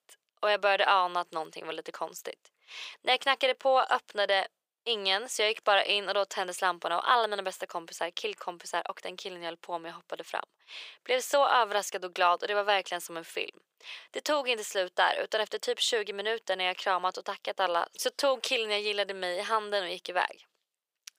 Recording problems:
thin; very; fading below 500 Hz

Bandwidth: 15 kHz